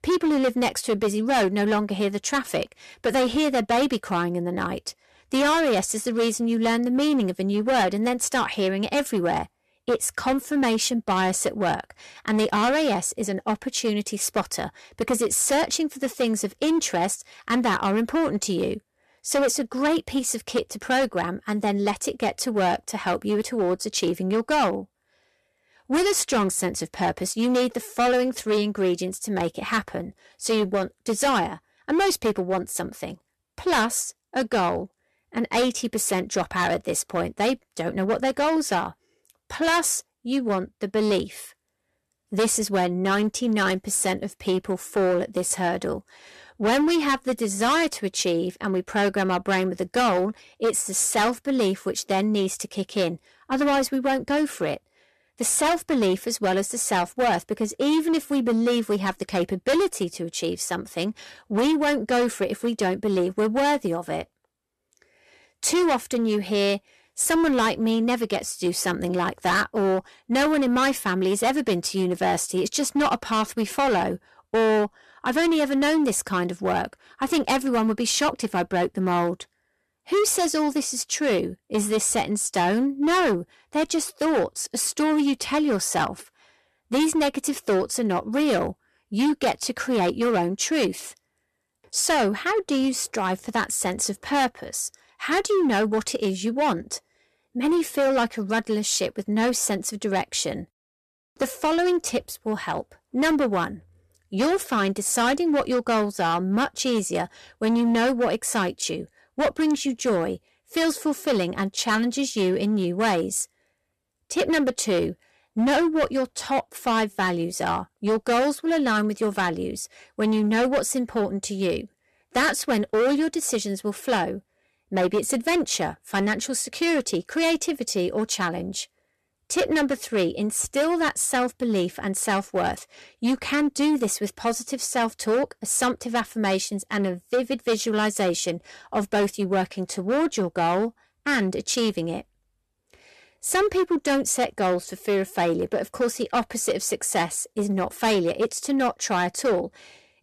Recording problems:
distortion; heavy; 11% of the sound clipped

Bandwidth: 13.5 kHz